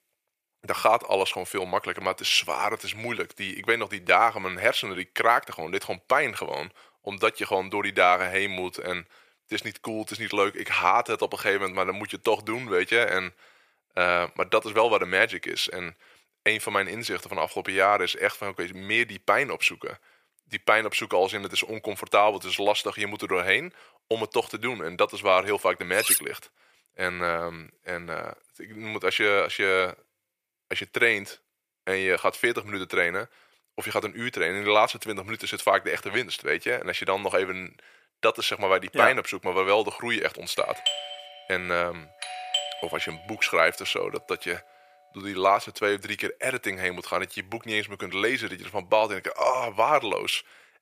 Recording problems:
thin; very; fading below 450 Hz
clattering dishes; loud; at 26 s; peak 3 dB above the speech
doorbell; noticeable; from 41 to 43 s; peak 2 dB below the speech

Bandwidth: 15 kHz